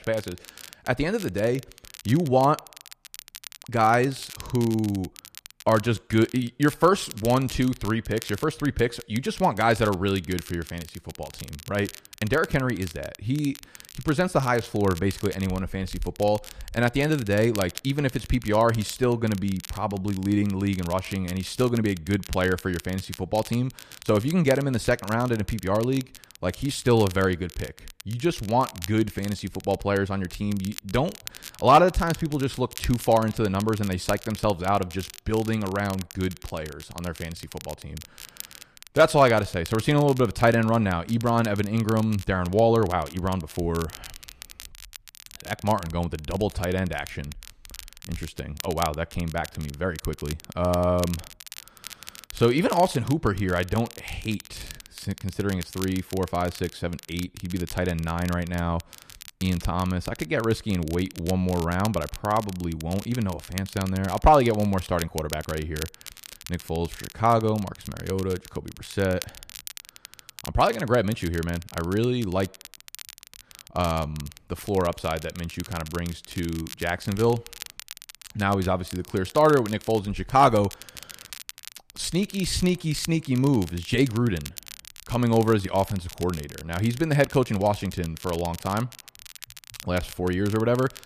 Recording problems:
crackle, like an old record; noticeable; 15 dB below the speech

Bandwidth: 14.5 kHz